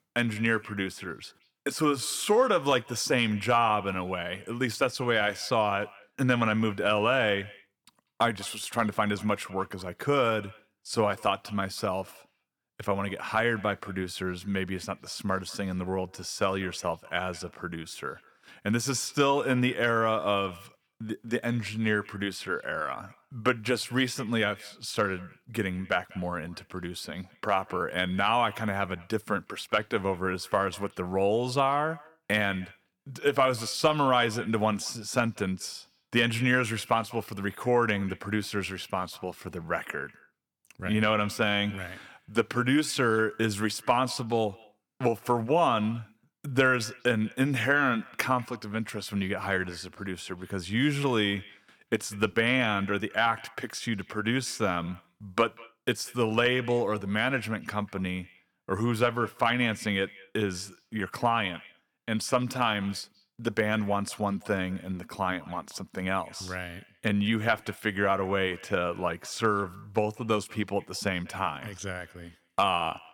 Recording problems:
echo of what is said; faint; throughout; 190 ms later, 25 dB below the speech

